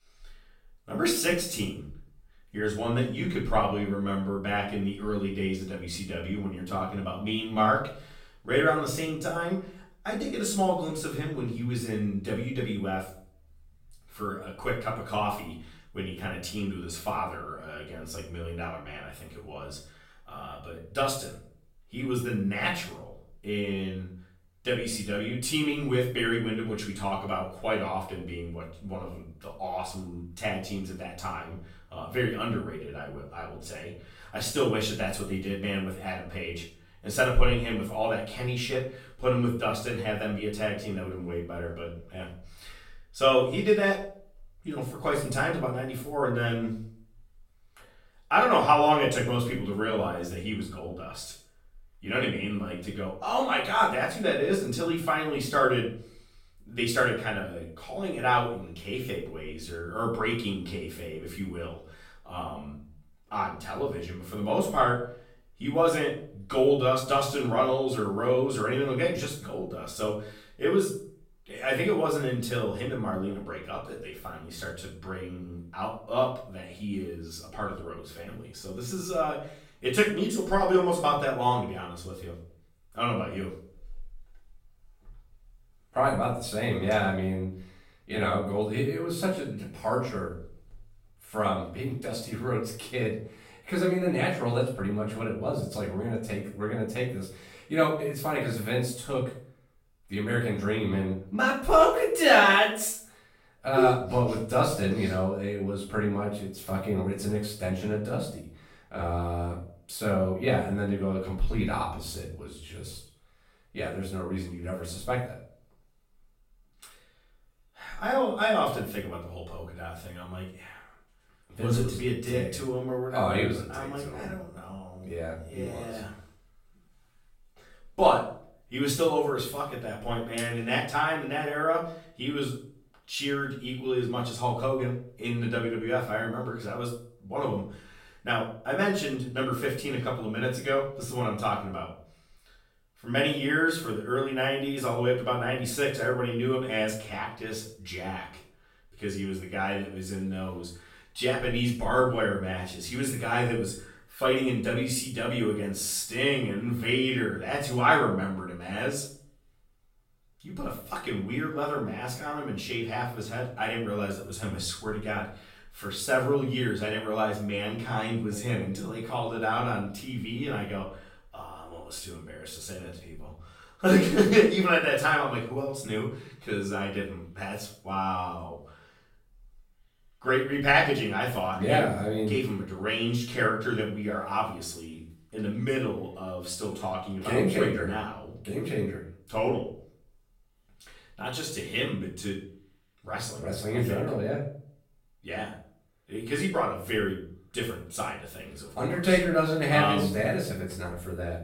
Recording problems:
off-mic speech; far
room echo; noticeable; dies away in 0.5 s

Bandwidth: 16.5 kHz